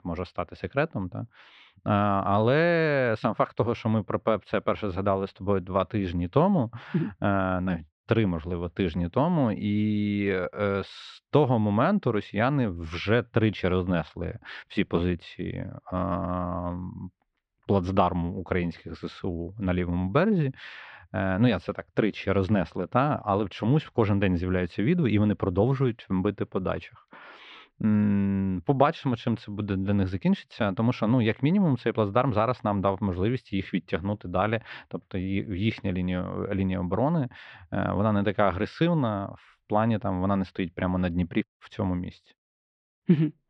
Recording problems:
muffled; slightly; fading above 3.5 kHz

